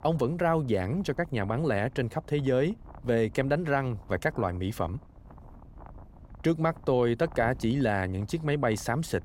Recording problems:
wind noise on the microphone; occasional gusts; 25 dB below the speech

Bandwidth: 16 kHz